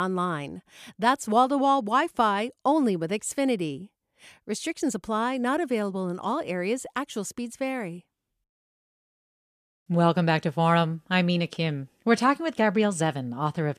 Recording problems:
abrupt cut into speech; at the start

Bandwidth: 14.5 kHz